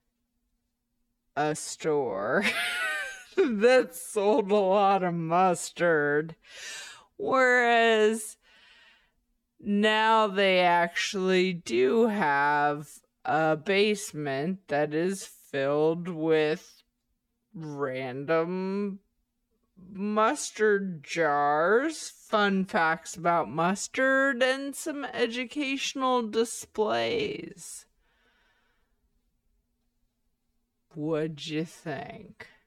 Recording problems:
wrong speed, natural pitch; too slow; 0.6 times normal speed

